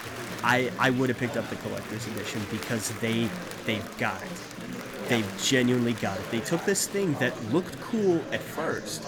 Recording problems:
murmuring crowd; loud; throughout; 9 dB below the speech

